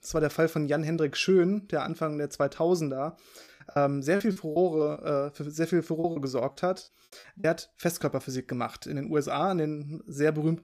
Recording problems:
choppy; very; from 3.5 to 5 s and from 6 to 7.5 s; 13% of the speech affected

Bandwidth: 14.5 kHz